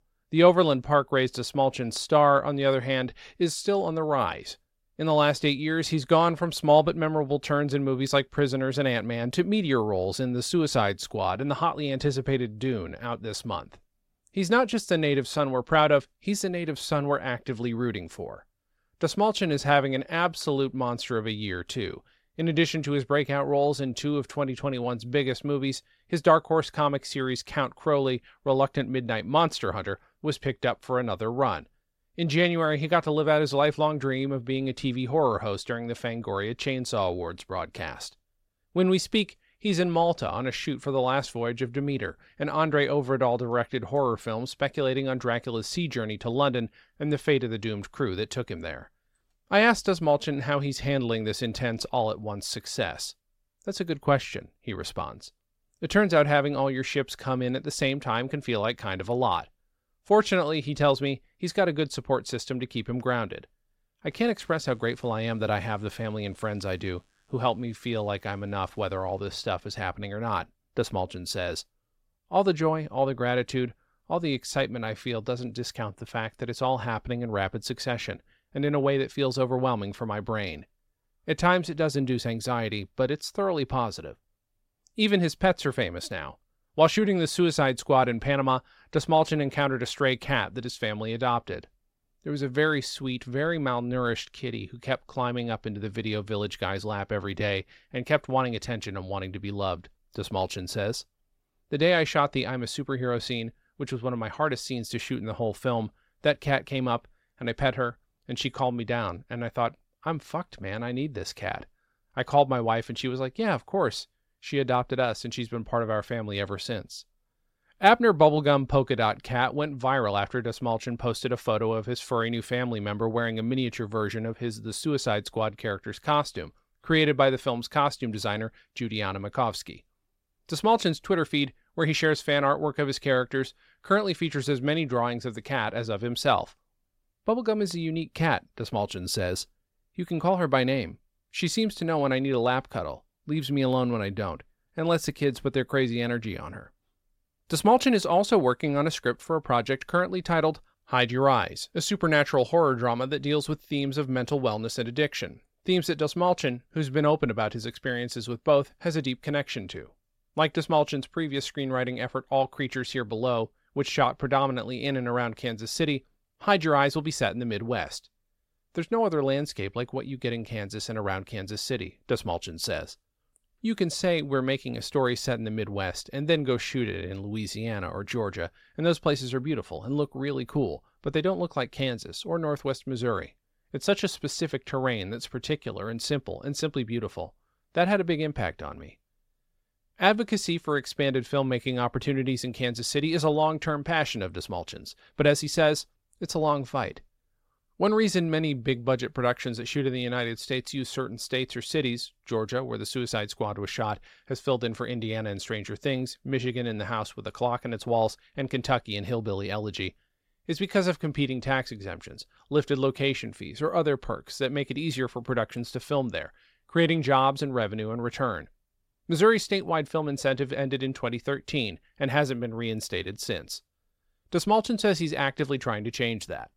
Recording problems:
none

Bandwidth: 16 kHz